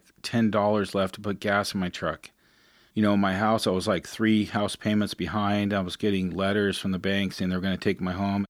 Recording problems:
none

